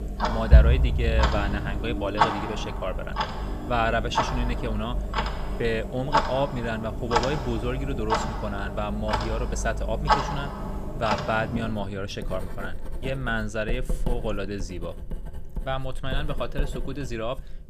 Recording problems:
household noises; very loud; throughout; 2 dB above the speech

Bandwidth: 14.5 kHz